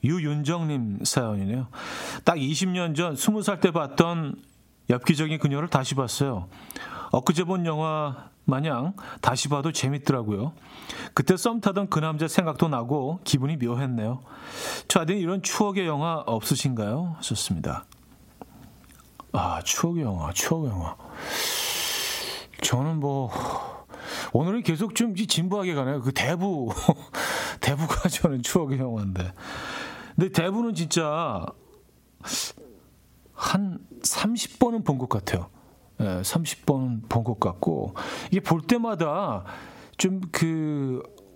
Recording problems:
squashed, flat; heavily

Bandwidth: 16 kHz